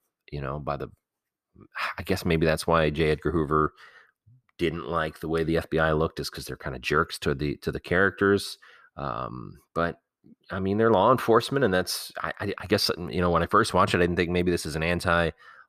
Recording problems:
none

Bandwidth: 14.5 kHz